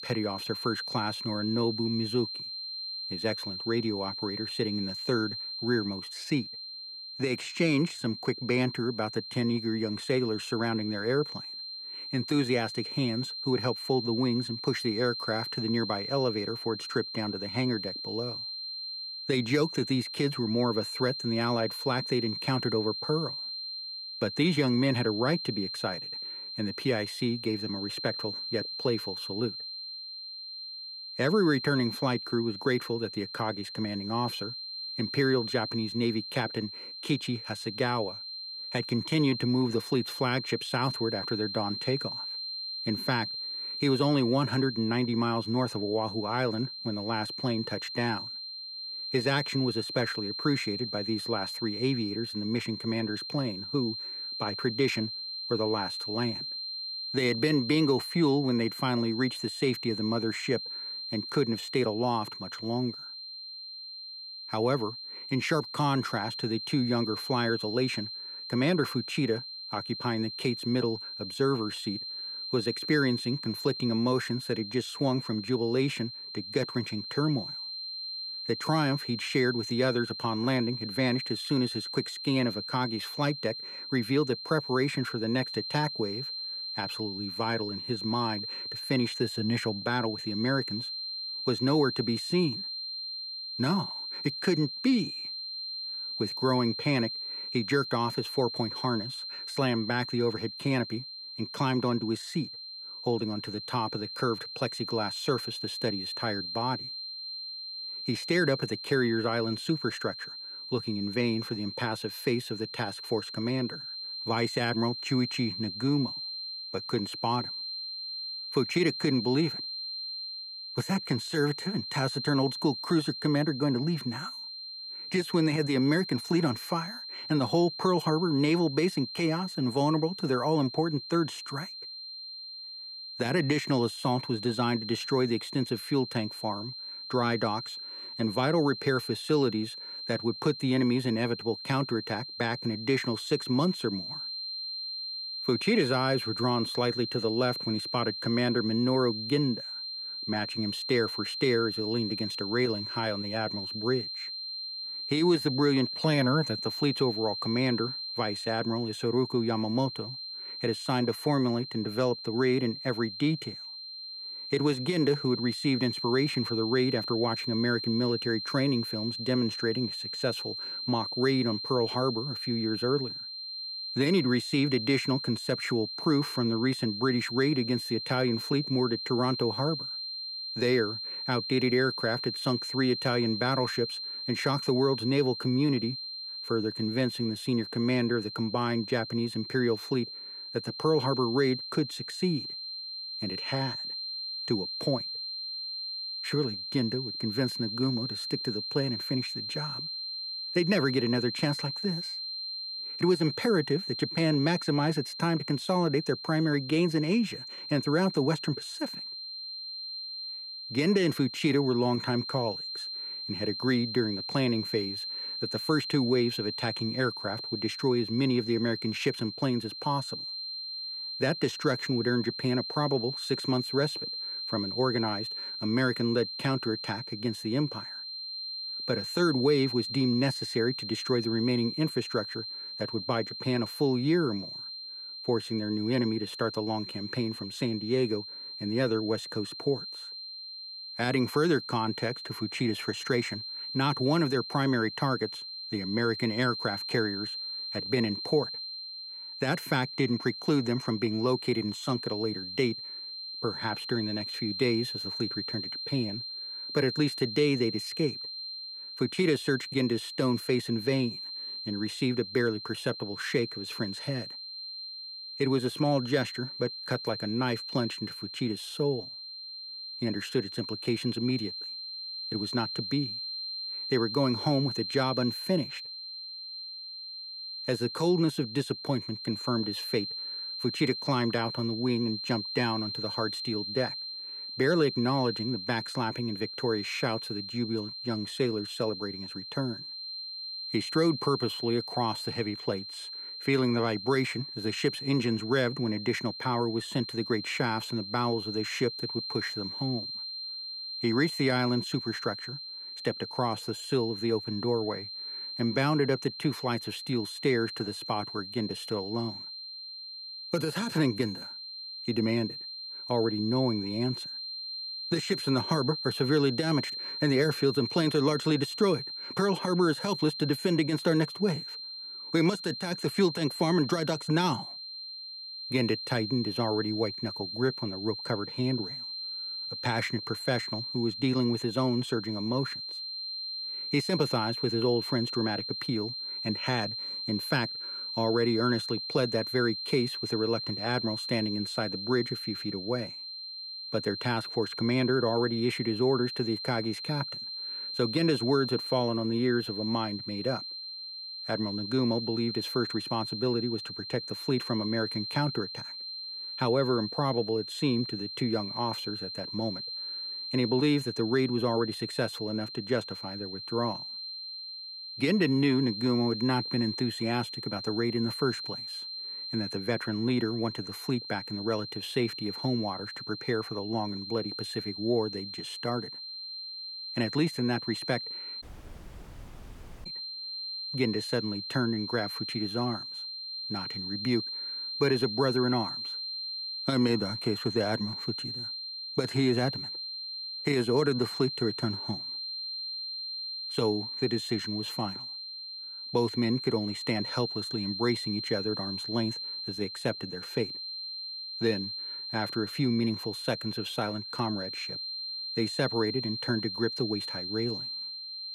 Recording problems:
high-pitched whine; loud; throughout; 4 kHz, 6 dB below the speech
audio cutting out; at 6:19 for 1.5 s

